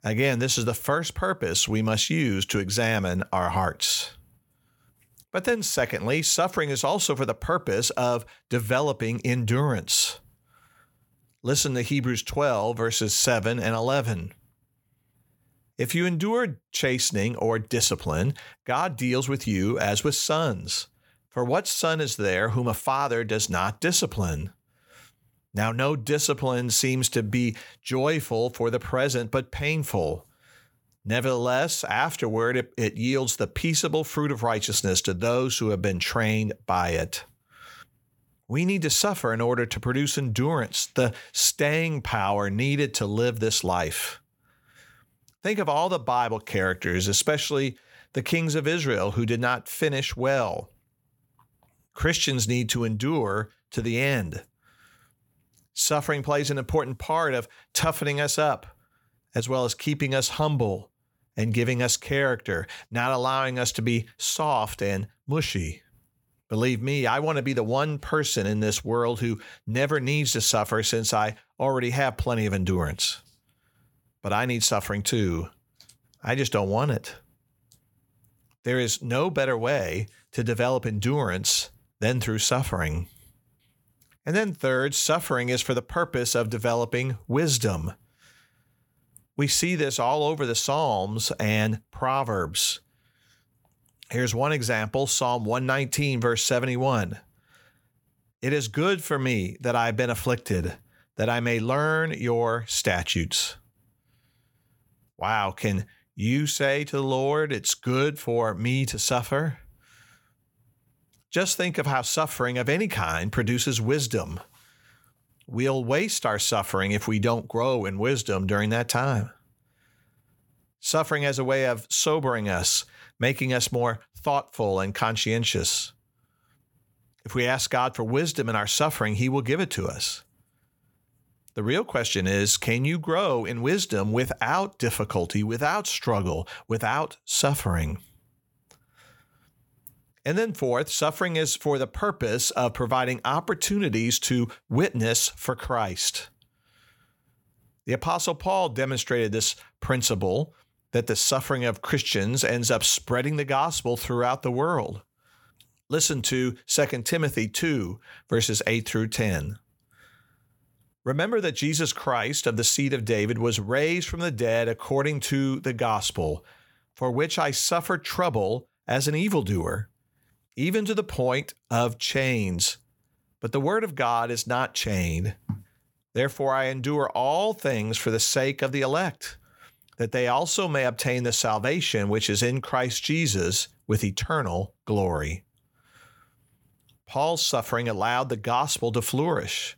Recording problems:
none

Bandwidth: 17 kHz